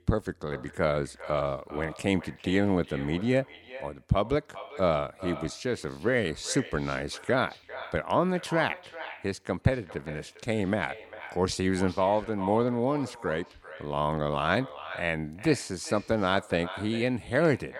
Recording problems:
echo of what is said; noticeable; throughout; 400 ms later, 15 dB below the speech

